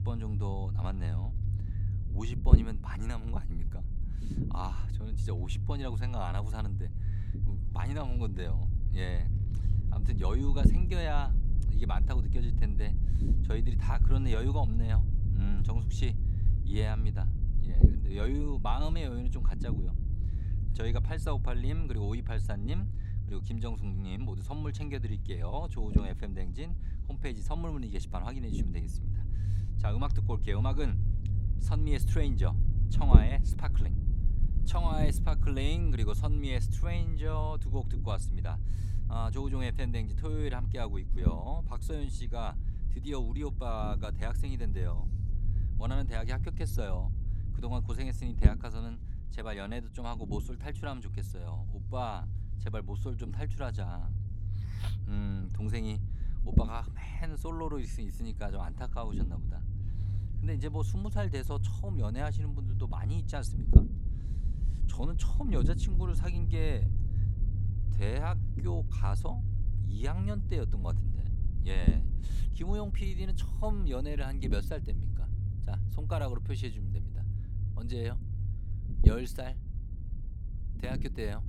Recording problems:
low rumble; loud; throughout; 6 dB below the speech

